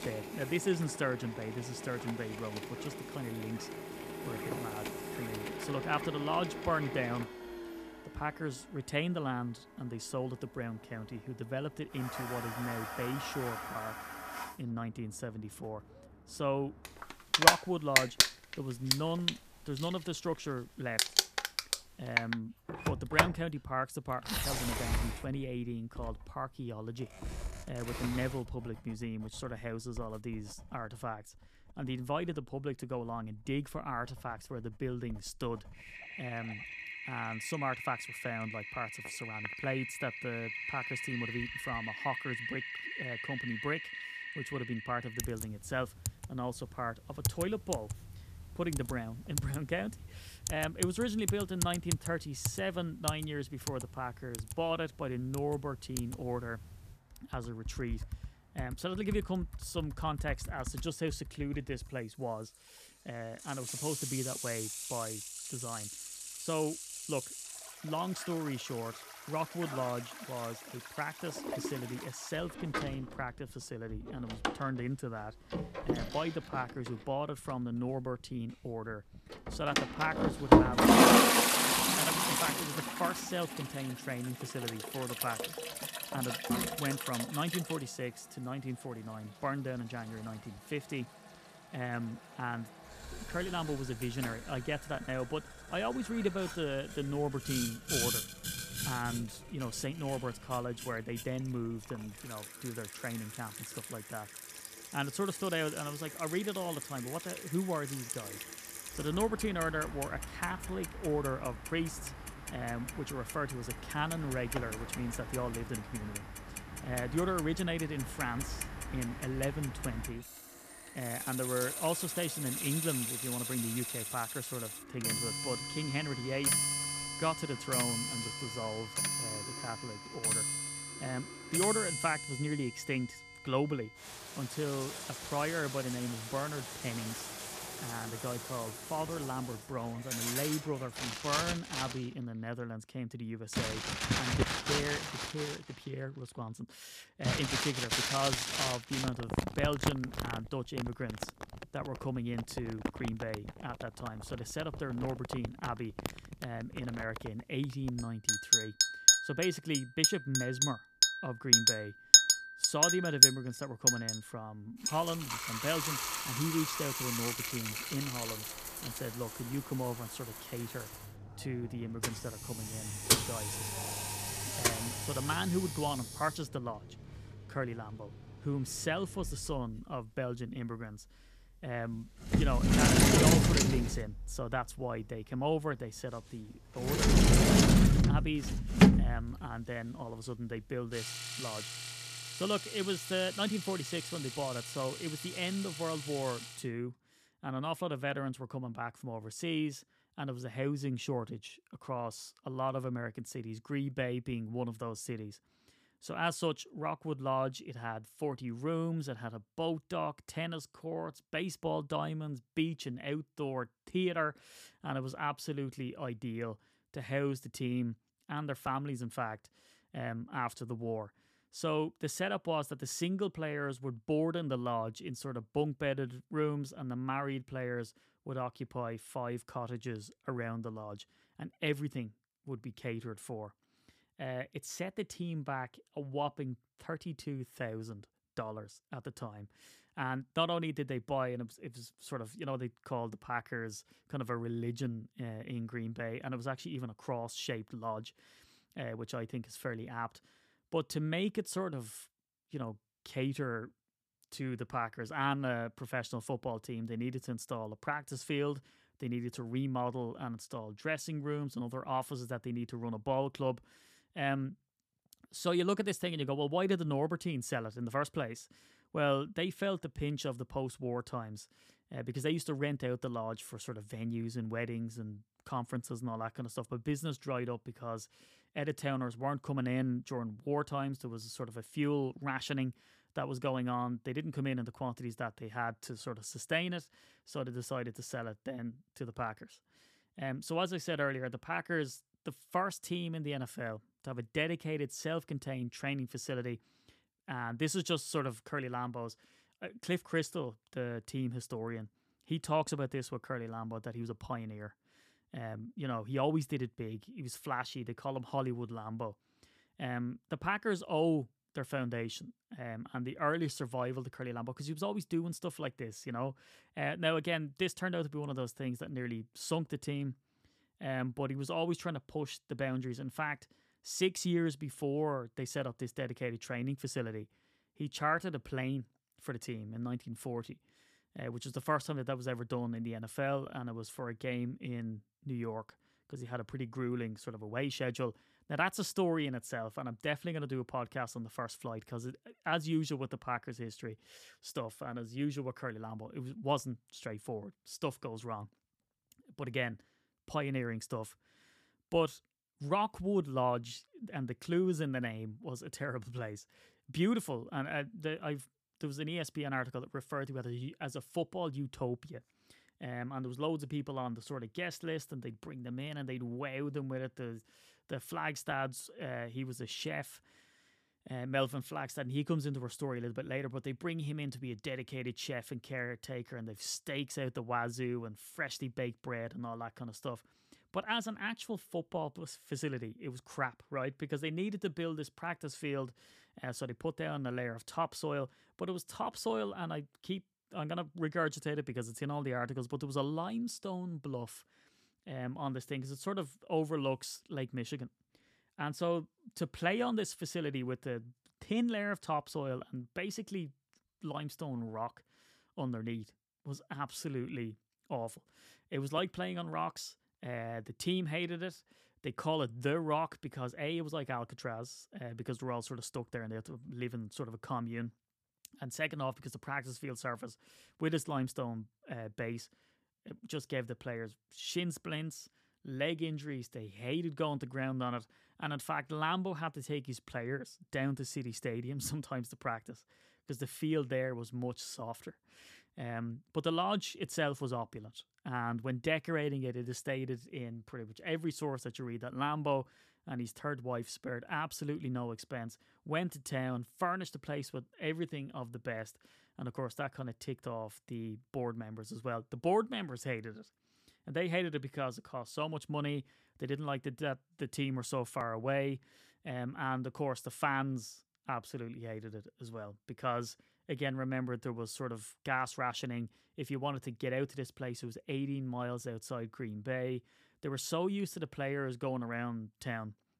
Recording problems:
household noises; very loud; until 3:17; 5 dB above the speech

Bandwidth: 14.5 kHz